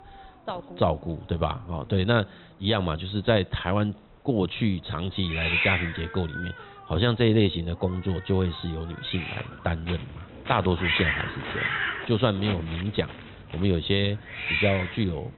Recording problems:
high frequencies cut off; severe; nothing above 4 kHz
hiss; loud; throughout; 2 dB below the speech
footsteps; noticeable; from 9.5 s on; peak 9 dB below the speech

